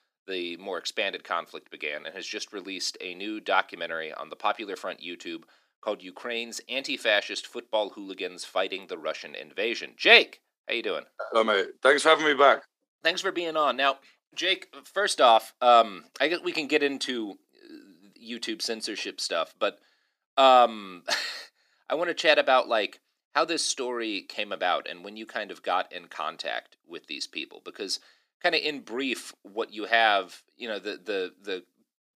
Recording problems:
thin; somewhat; fading below 350 Hz

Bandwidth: 15 kHz